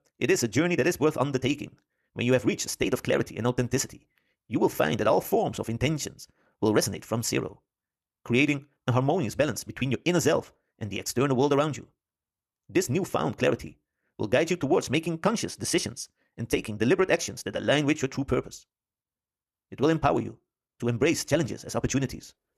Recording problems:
wrong speed, natural pitch; too fast; 1.8 times normal speed

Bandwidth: 13.5 kHz